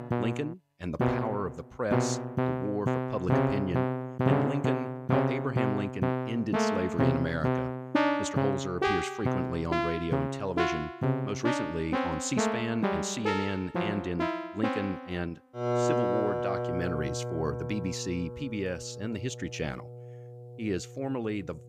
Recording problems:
background music; very loud; throughout; 4 dB above the speech

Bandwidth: 15.5 kHz